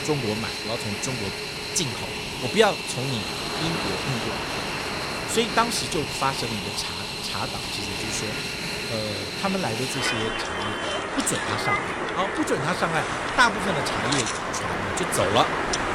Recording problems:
train or aircraft noise; very loud; throughout; as loud as the speech

